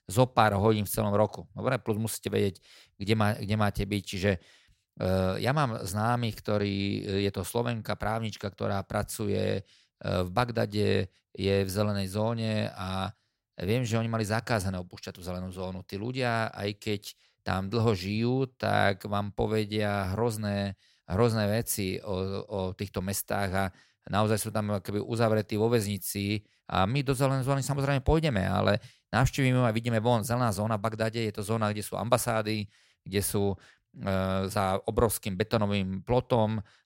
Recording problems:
none

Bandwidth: 16 kHz